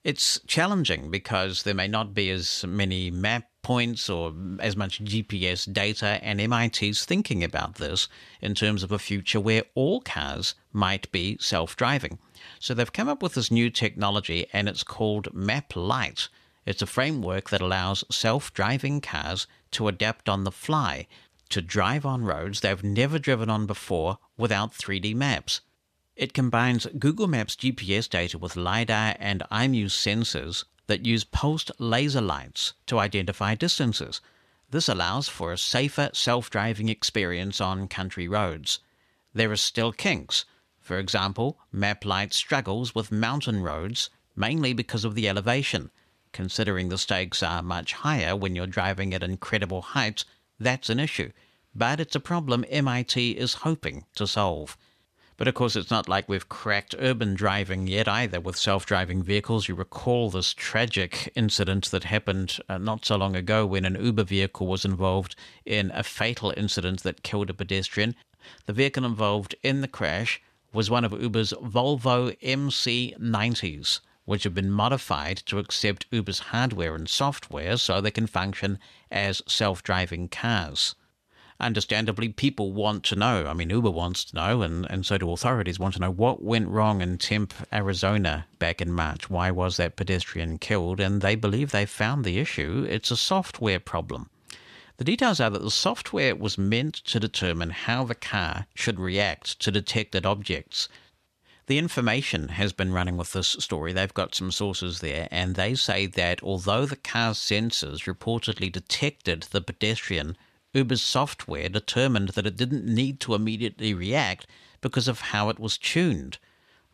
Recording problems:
none

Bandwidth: 14 kHz